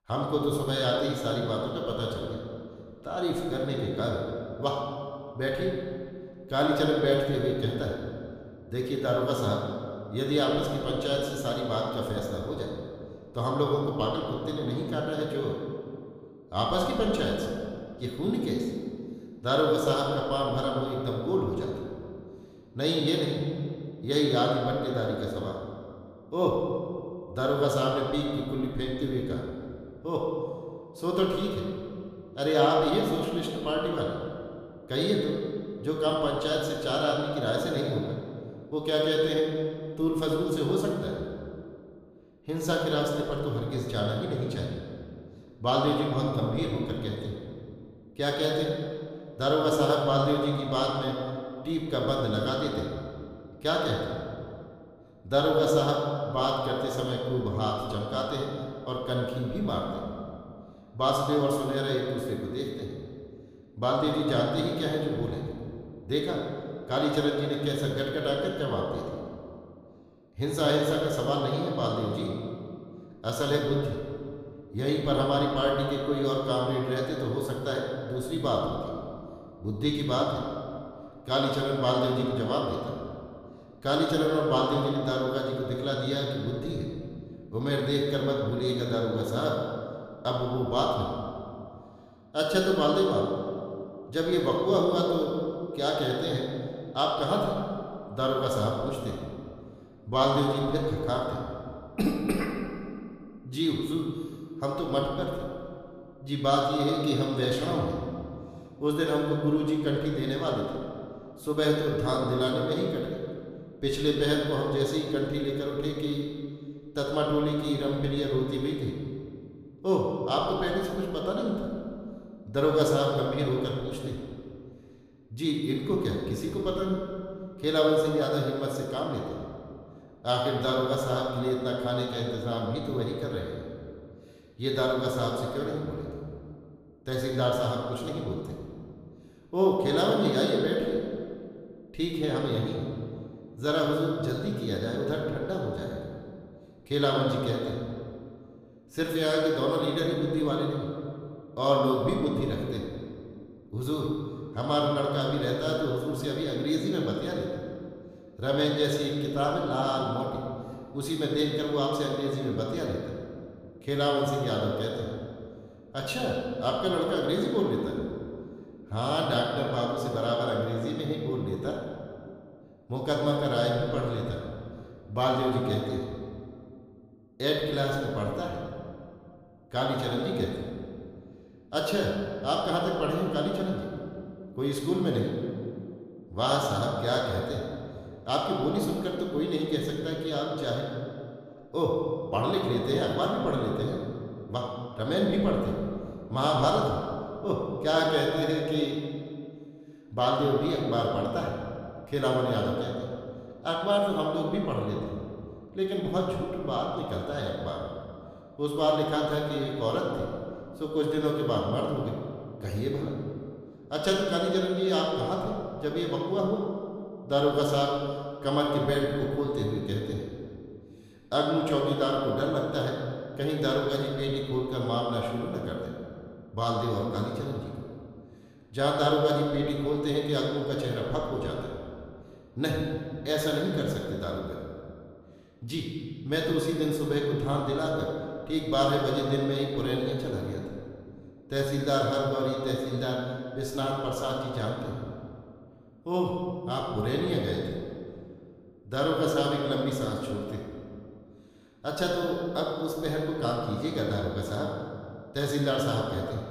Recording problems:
room echo; noticeable; dies away in 1.9 s
off-mic speech; somewhat distant

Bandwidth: 15 kHz